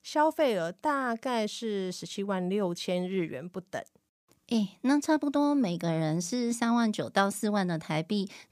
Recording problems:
none

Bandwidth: 15 kHz